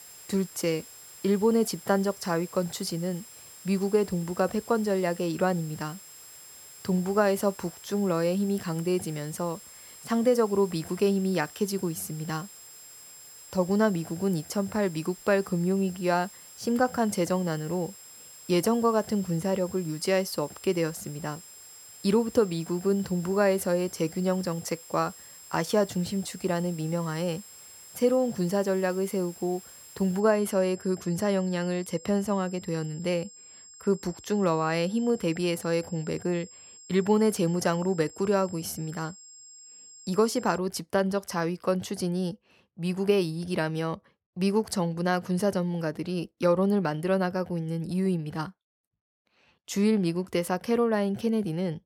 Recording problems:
high-pitched whine; noticeable; until 41 s; 7.5 kHz, 20 dB below the speech
hiss; faint; until 30 s; 20 dB below the speech

